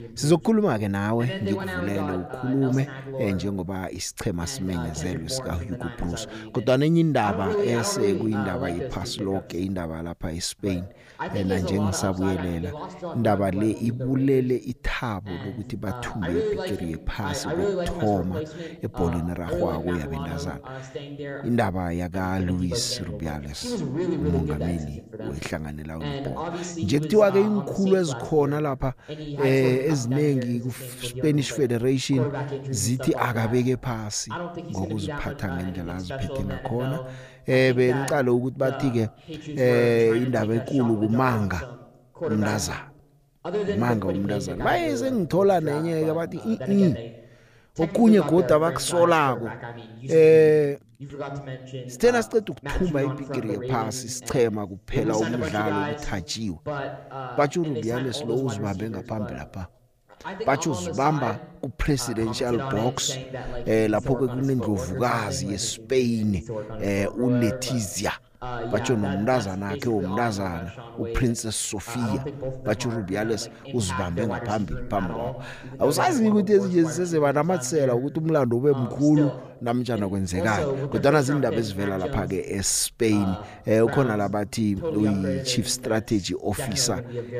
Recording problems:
voice in the background; loud; throughout; 8 dB below the speech

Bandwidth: 15 kHz